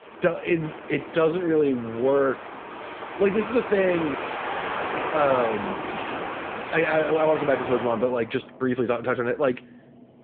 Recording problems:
phone-call audio; poor line
traffic noise; loud; throughout; 8 dB below the speech

